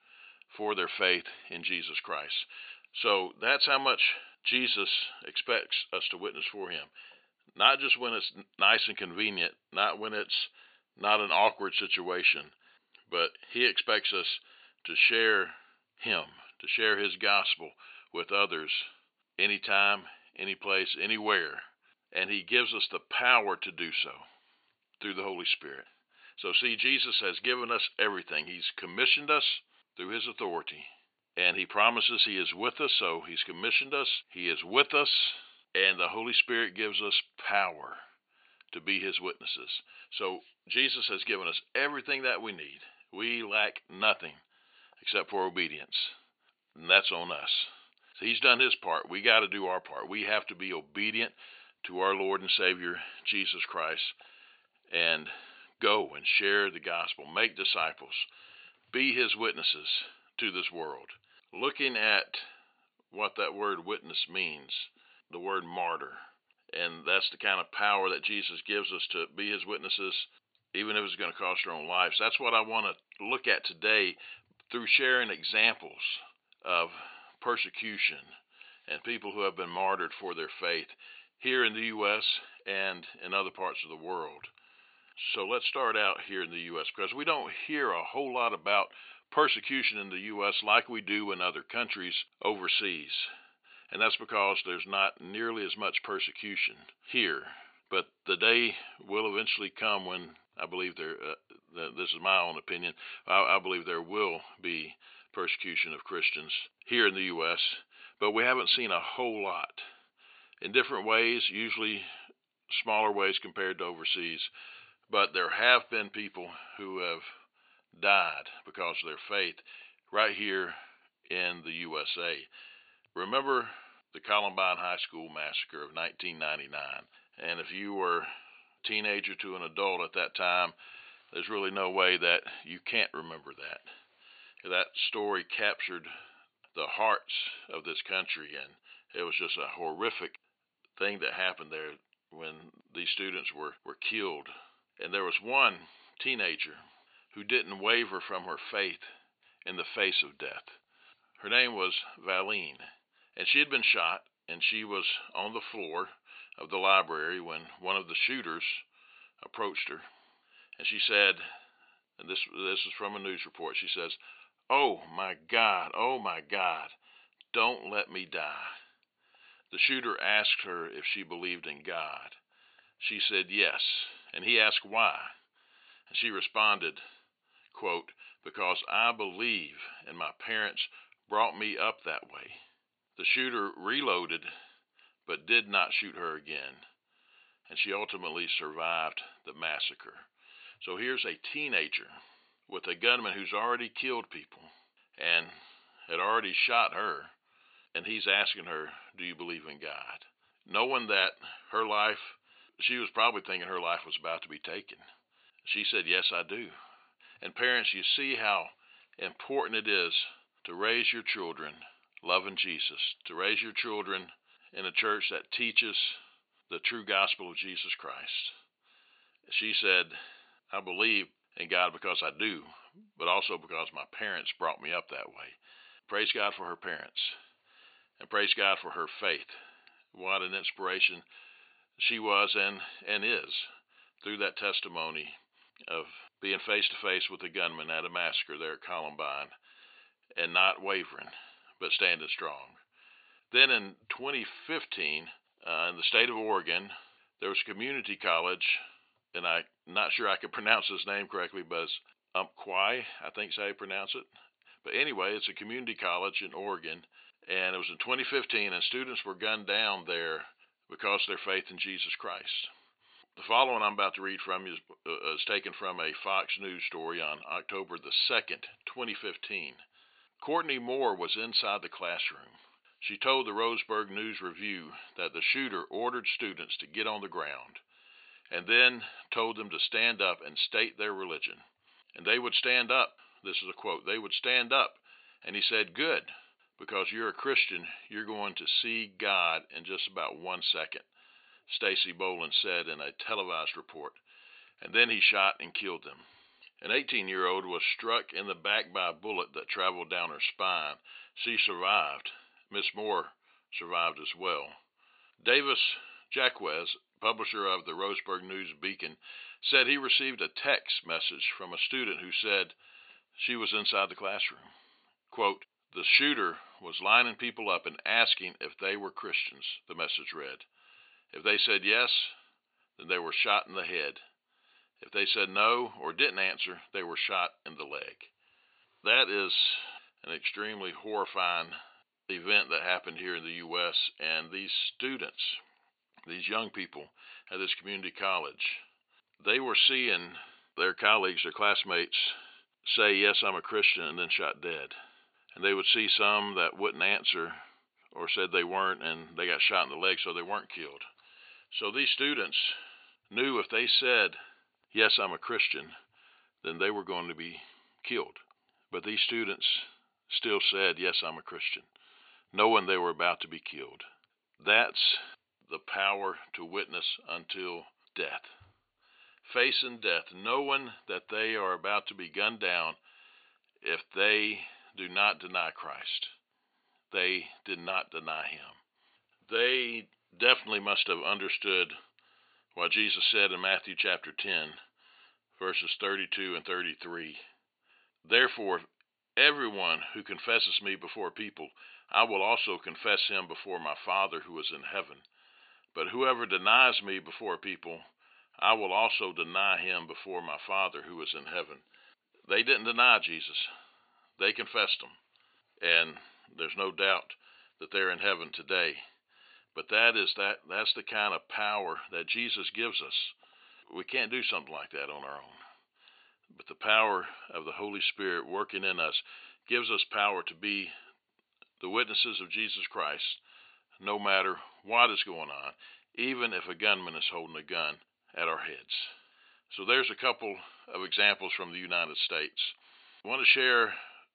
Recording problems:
thin; very; fading below 550 Hz
high frequencies cut off; severe; nothing above 4.5 kHz

